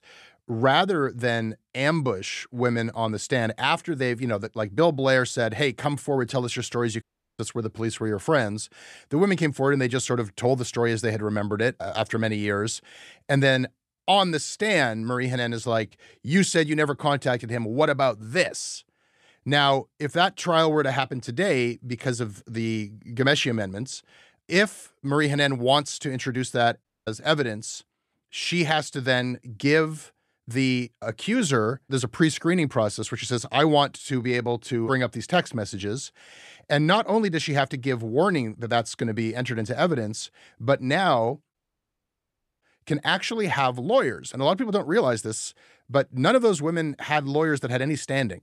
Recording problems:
audio cutting out; at 7 s, at 27 s and at 42 s for 1 s

